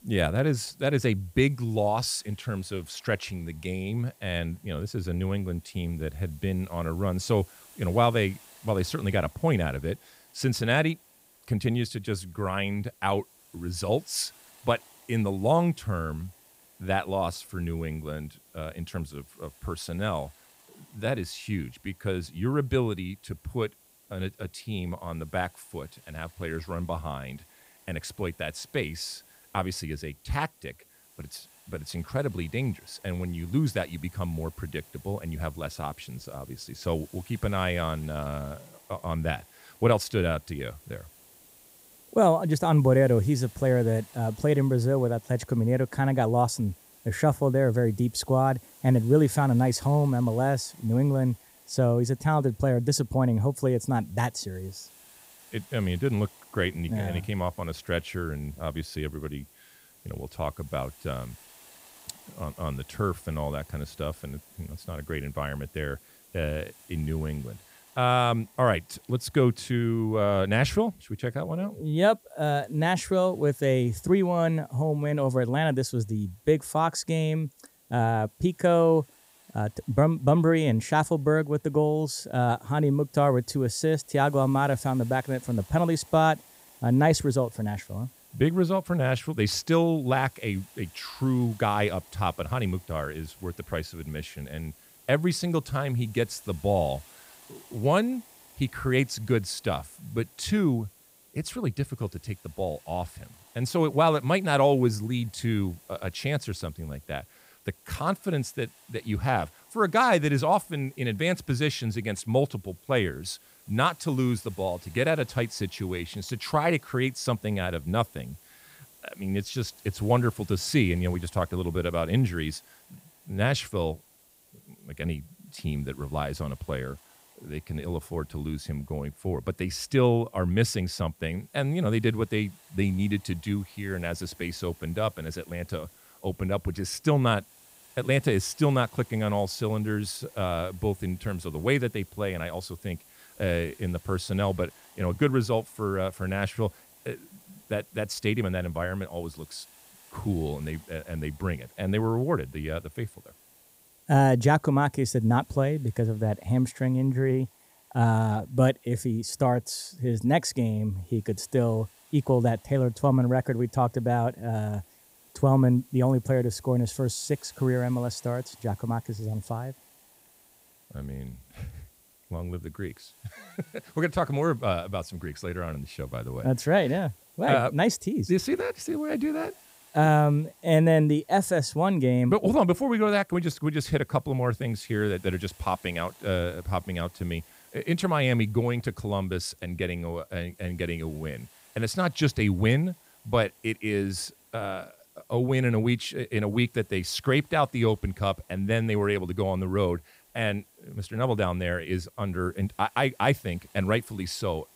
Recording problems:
hiss; faint; throughout; 25 dB below the speech

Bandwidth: 15.5 kHz